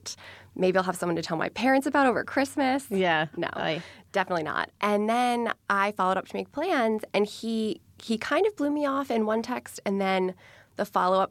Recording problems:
none

